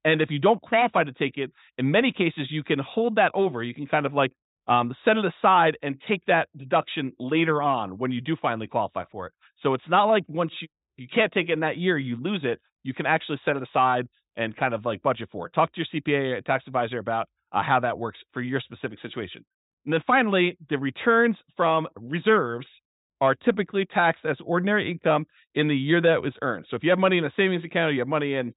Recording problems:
high frequencies cut off; severe; nothing above 4 kHz

